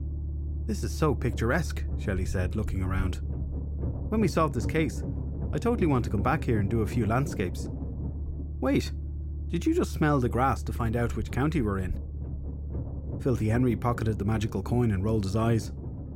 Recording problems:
low rumble; noticeable; throughout; 15 dB below the speech

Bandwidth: 16 kHz